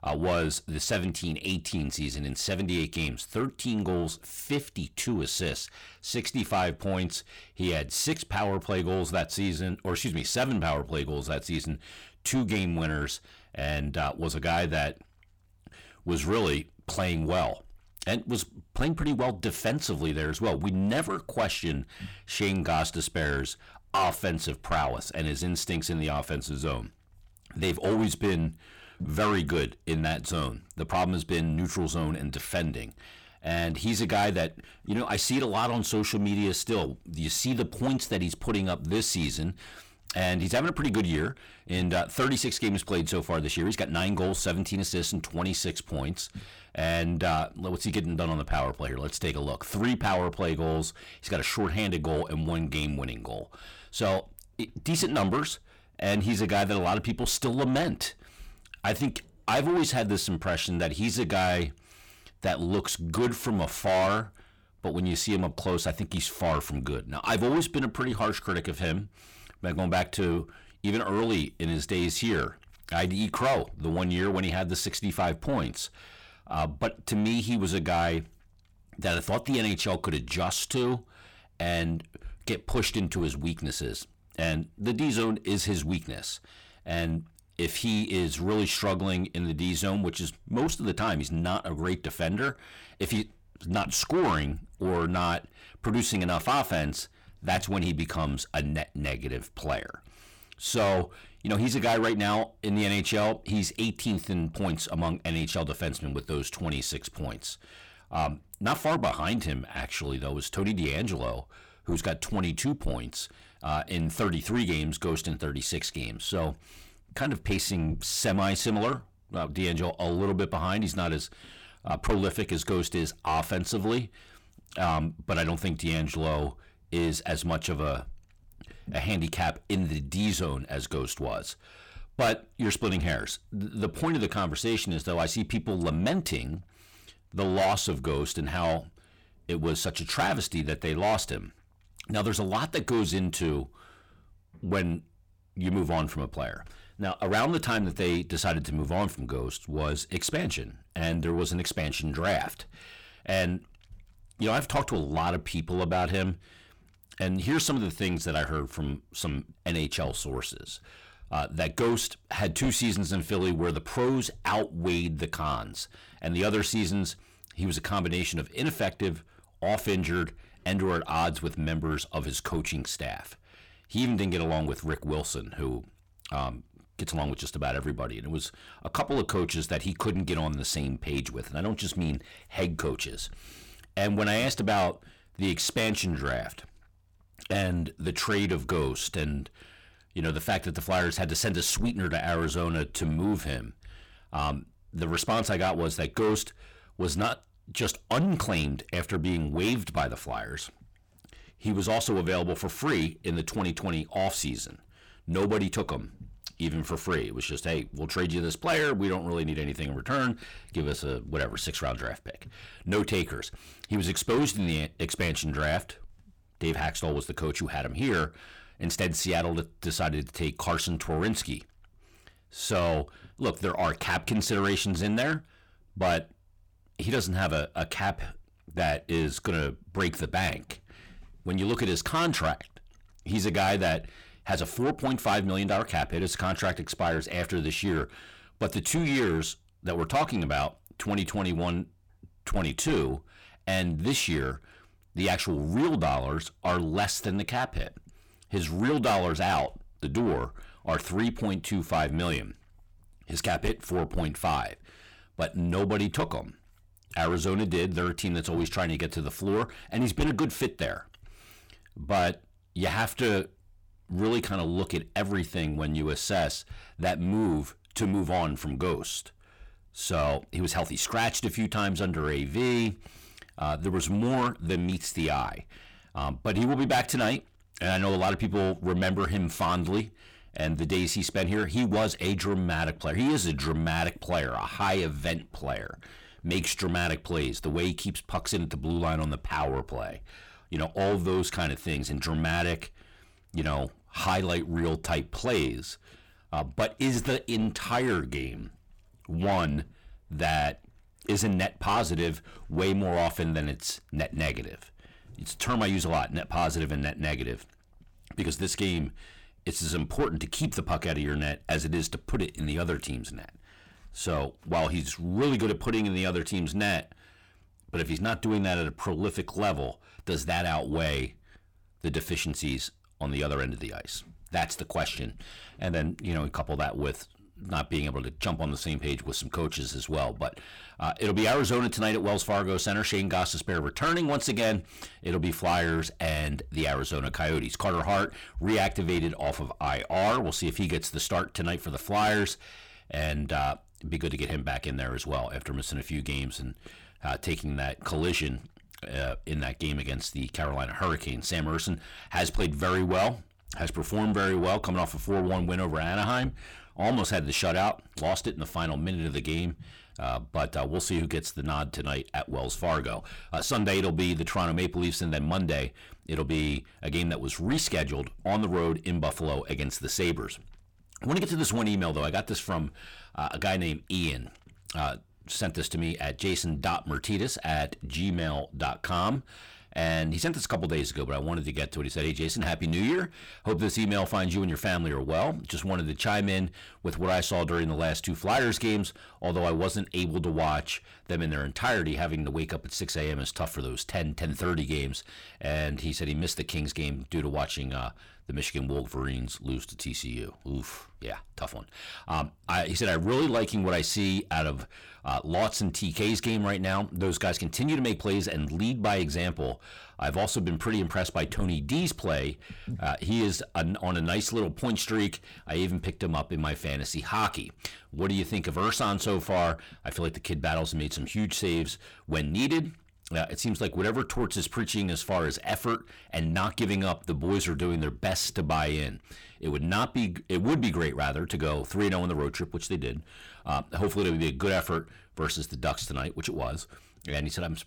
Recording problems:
distortion; heavy; 8 dB below the speech

